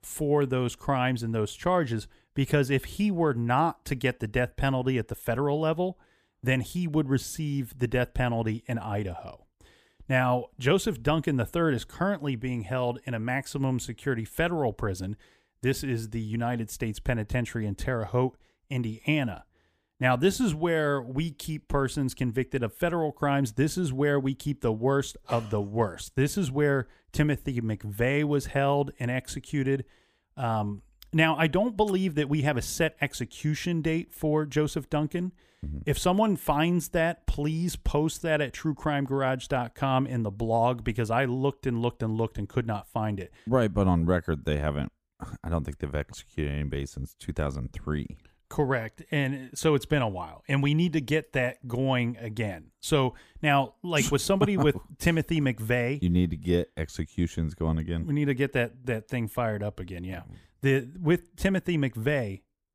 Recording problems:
none

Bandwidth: 15 kHz